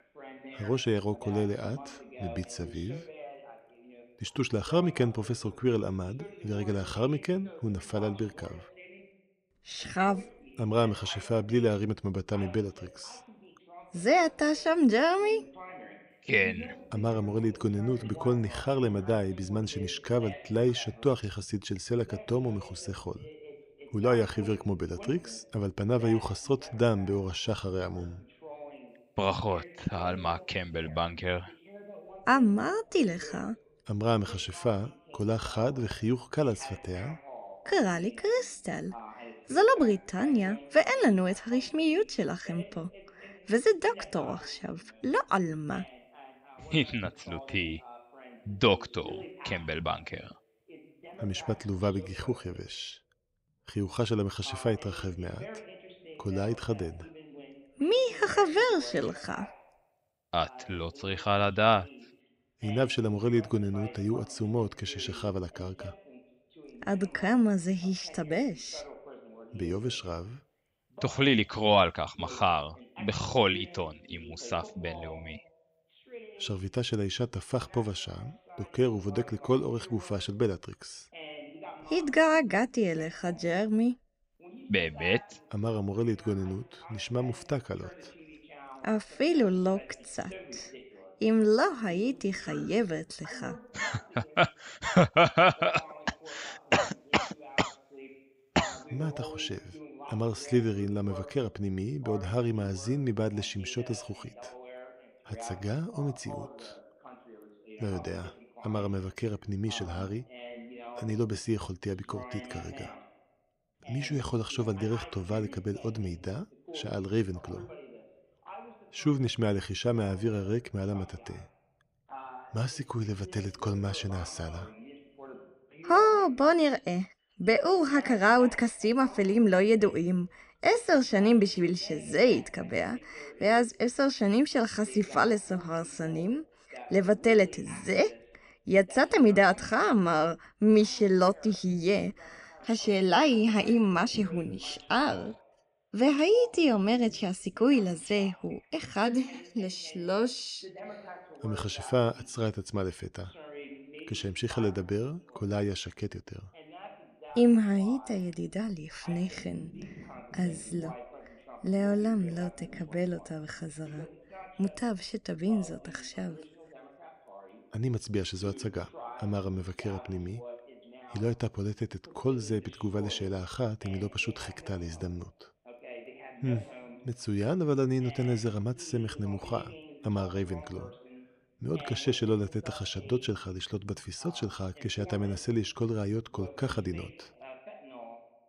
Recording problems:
voice in the background; noticeable; throughout; 20 dB below the speech

